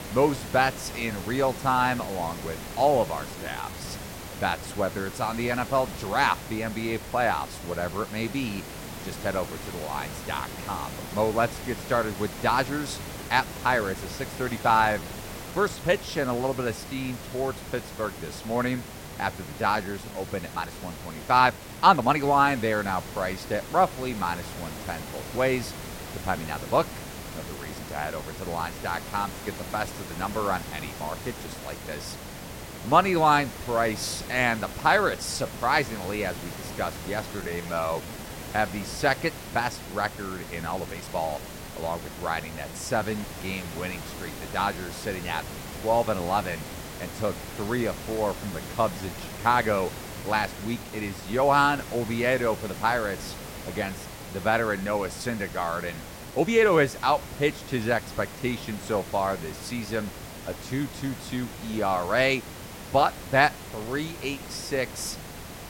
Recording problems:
hiss; noticeable; throughout; 10 dB below the speech
uneven, jittery; strongly; from 3.5 to 57 s

